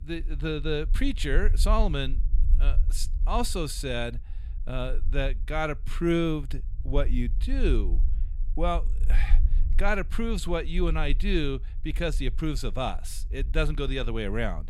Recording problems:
low rumble; faint; throughout; 20 dB below the speech

